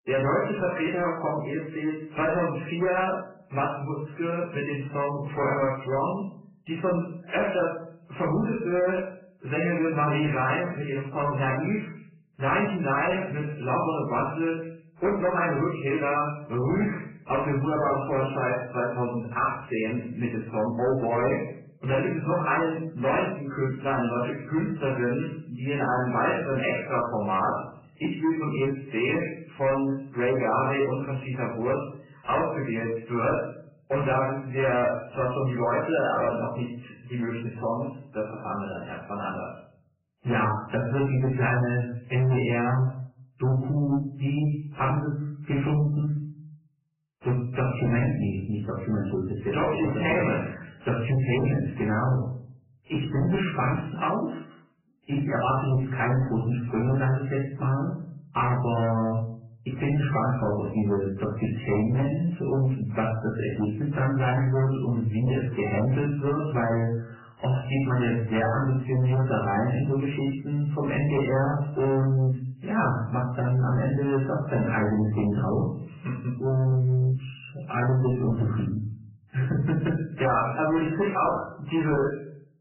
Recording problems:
off-mic speech; far
garbled, watery; badly; nothing above 3 kHz
room echo; slight; dies away in 0.5 s
distortion; slight; 10 dB below the speech

